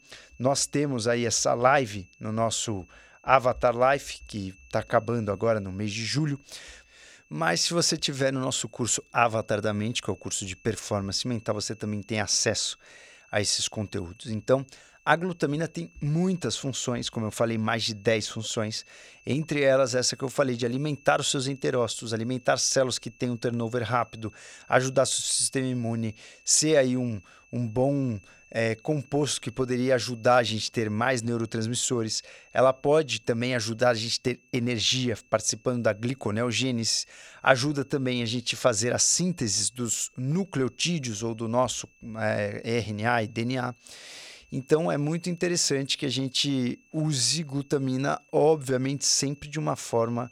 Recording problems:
high-pitched whine; faint; throughout; 2.5 kHz, 30 dB below the speech

